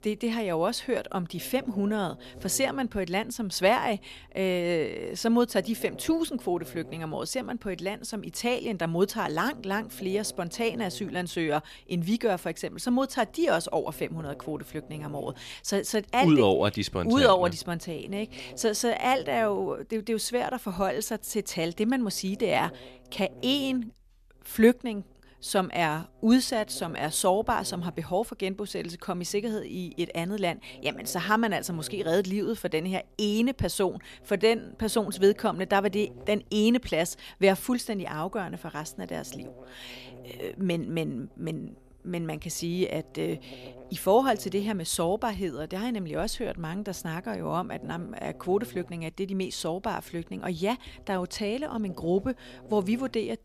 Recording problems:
electrical hum; faint; throughout; 60 Hz, 25 dB below the speech

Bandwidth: 14.5 kHz